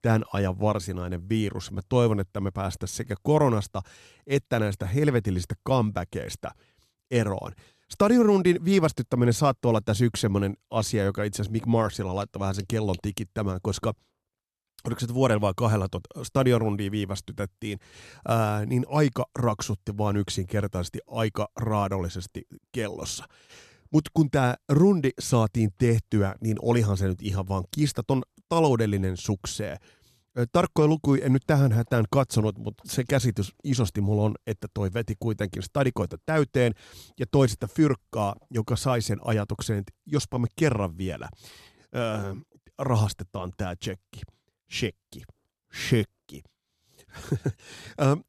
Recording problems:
none

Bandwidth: 13.5 kHz